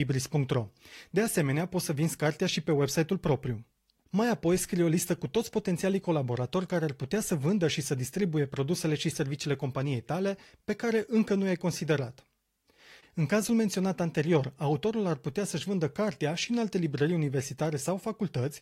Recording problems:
garbled, watery; slightly
abrupt cut into speech; at the start

